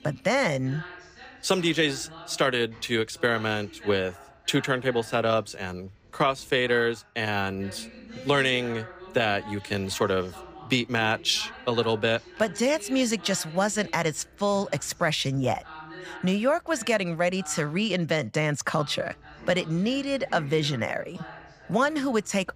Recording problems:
voice in the background; noticeable; throughout; 20 dB below the speech

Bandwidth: 15 kHz